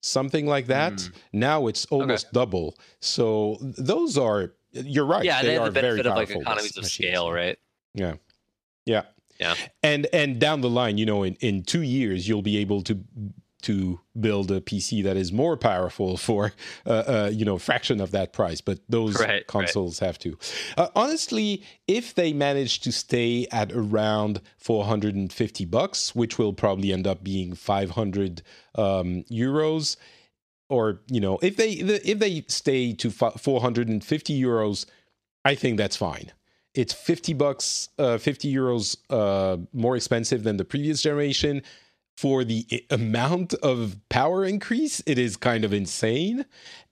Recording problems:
none

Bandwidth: 14 kHz